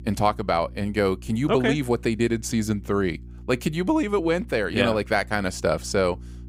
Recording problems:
electrical hum; faint; throughout; 60 Hz, 30 dB below the speech

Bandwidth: 15.5 kHz